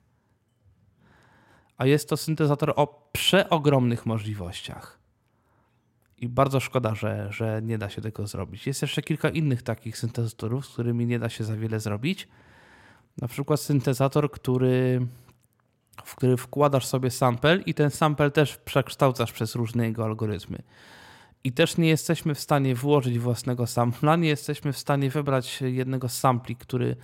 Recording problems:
none

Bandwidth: 16 kHz